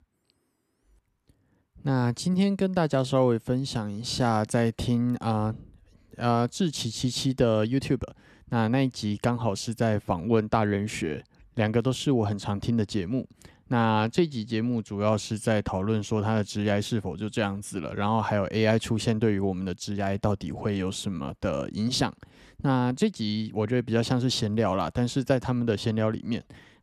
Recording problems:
none

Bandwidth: 13.5 kHz